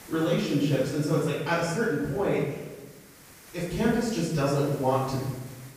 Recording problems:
off-mic speech; far
room echo; noticeable; dies away in 1 s
hiss; faint; throughout; 20 dB below the speech

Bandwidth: 15 kHz